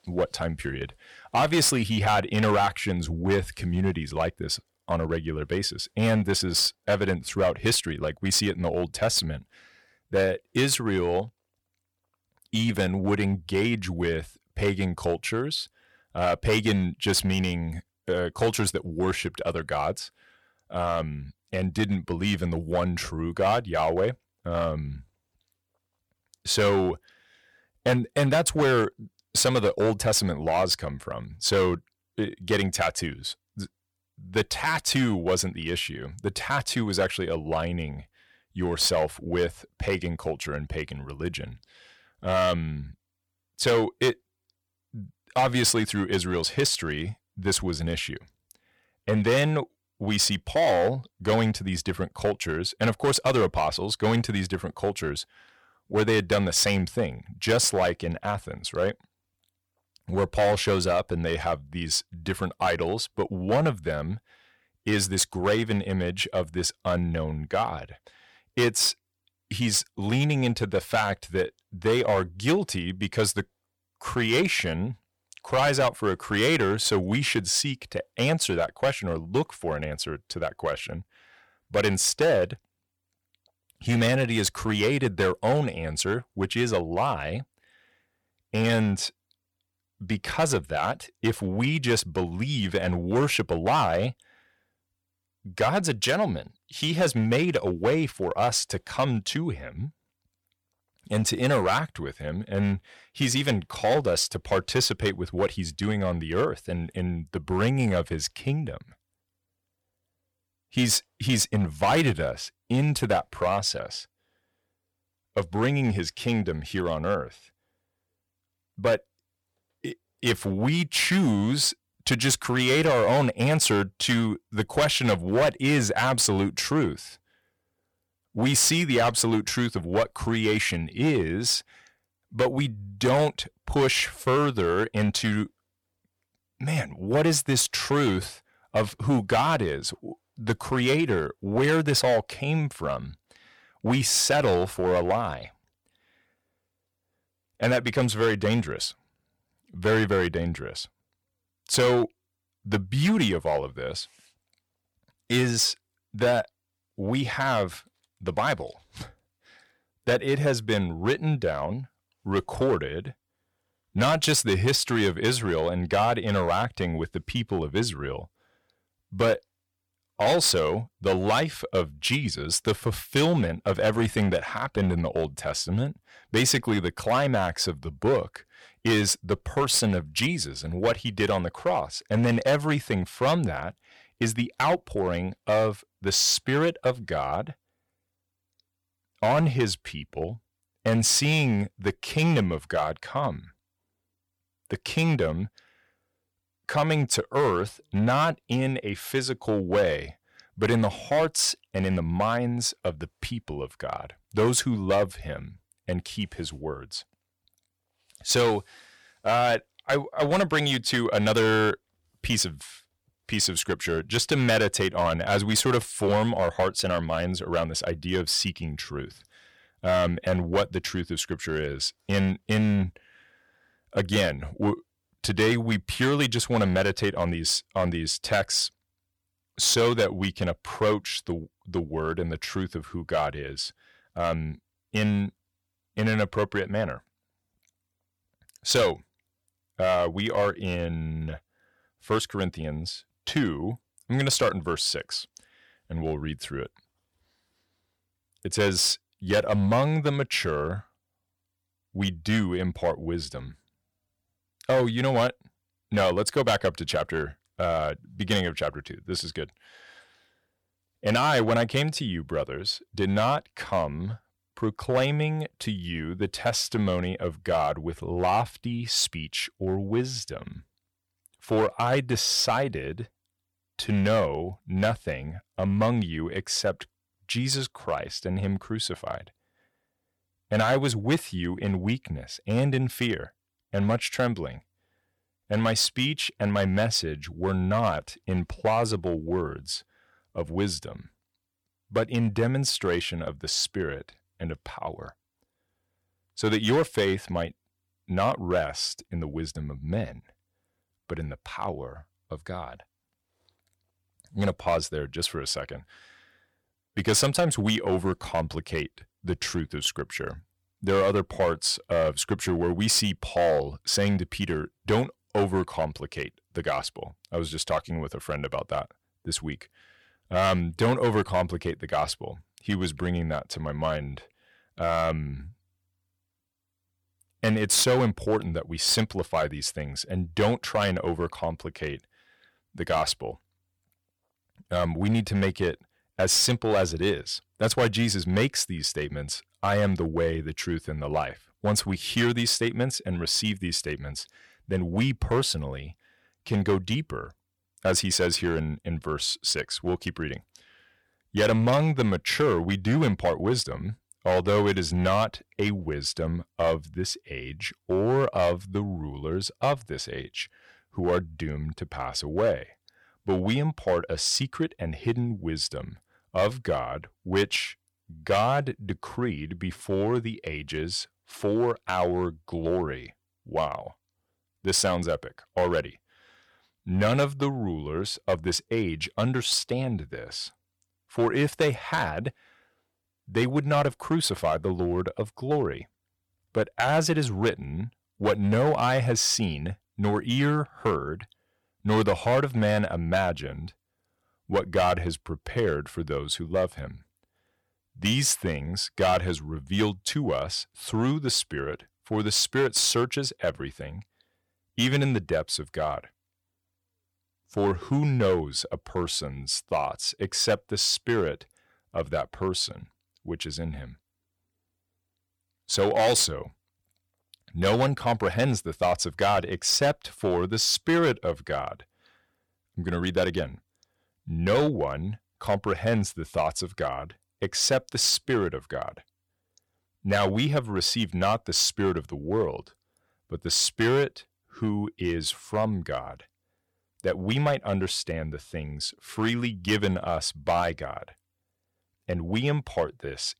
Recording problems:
distortion; slight; 4% of the sound clipped

